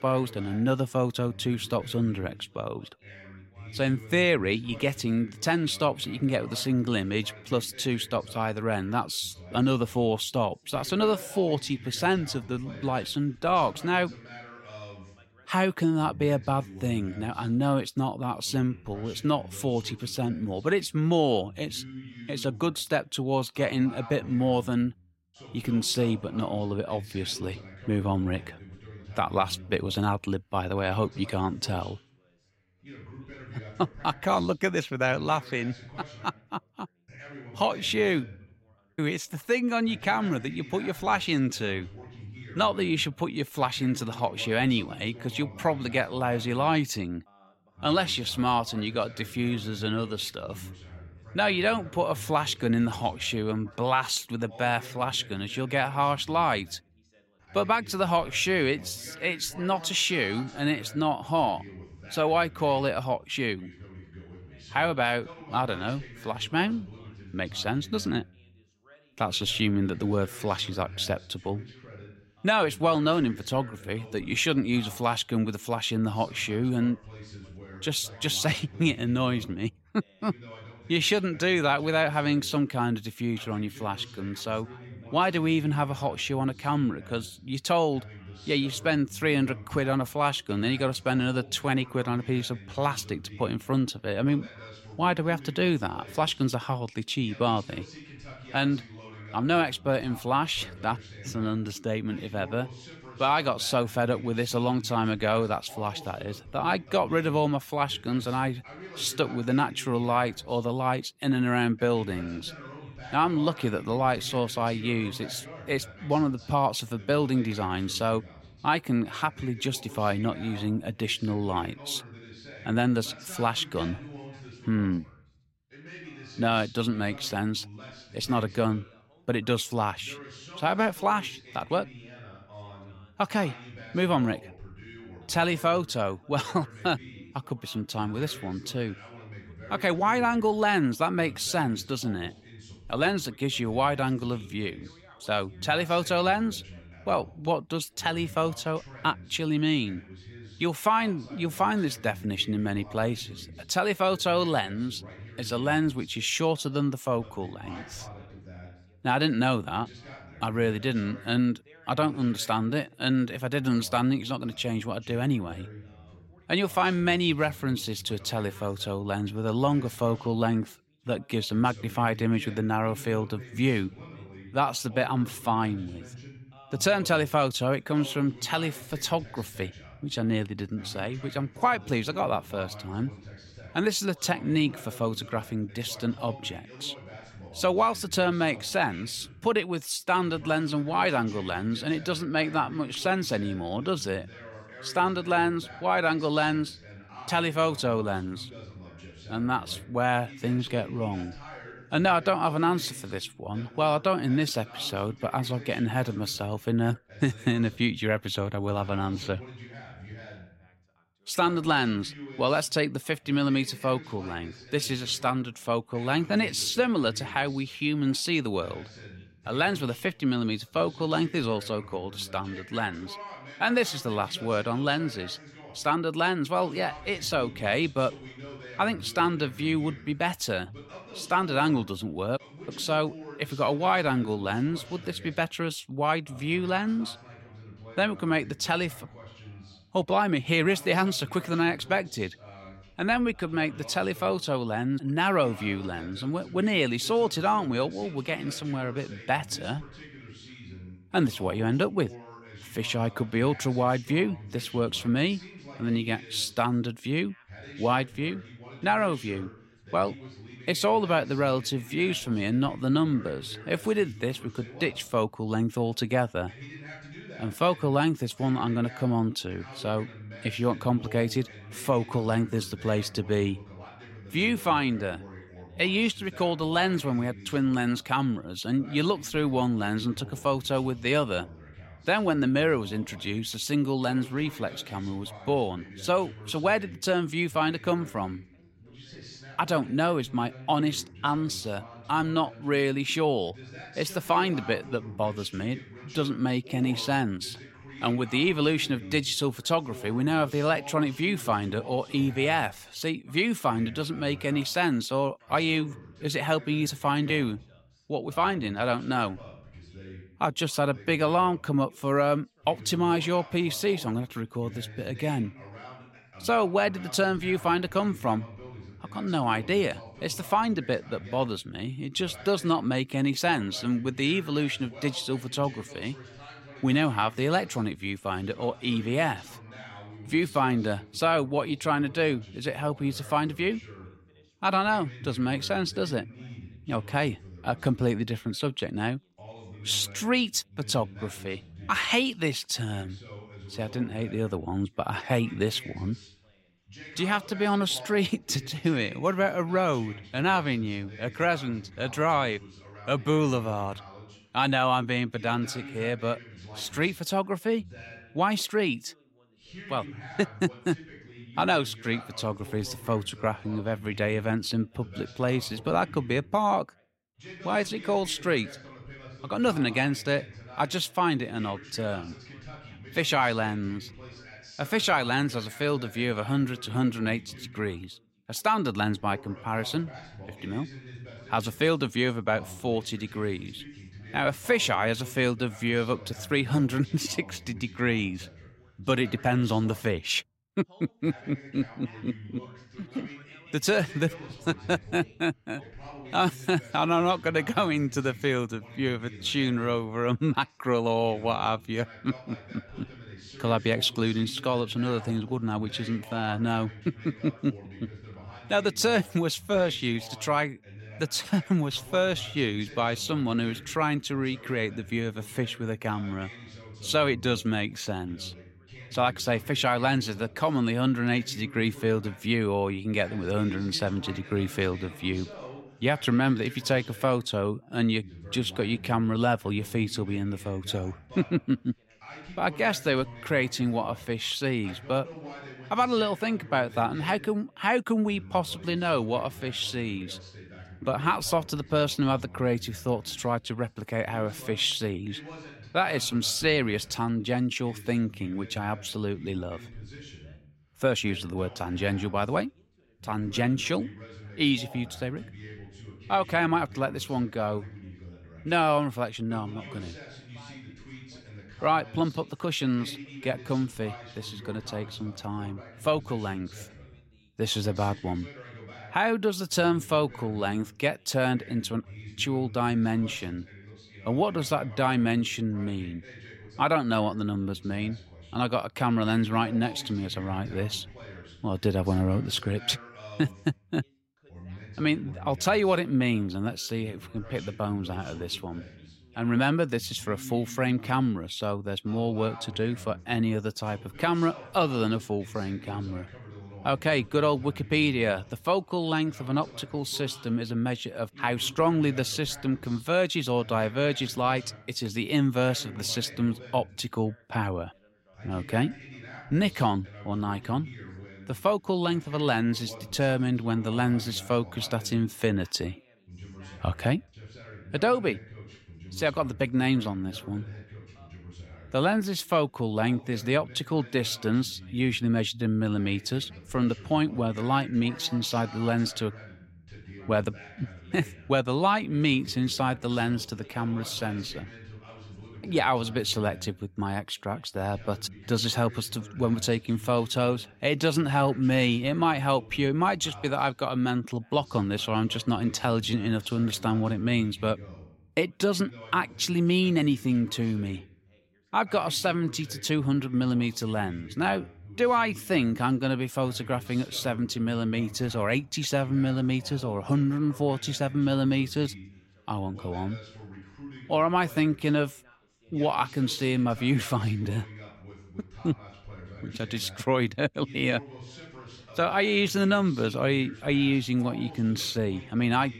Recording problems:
background chatter; noticeable; throughout; 2 voices, 20 dB below the speech

